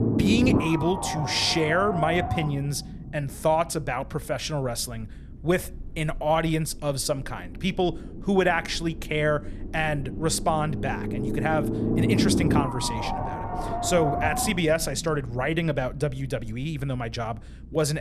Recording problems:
low rumble; loud; throughout; 3 dB below the speech
abrupt cut into speech; at the end

